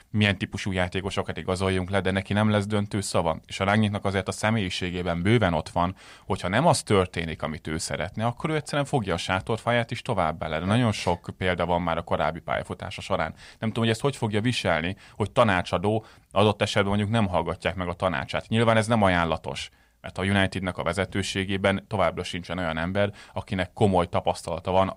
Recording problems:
none

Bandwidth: 15.5 kHz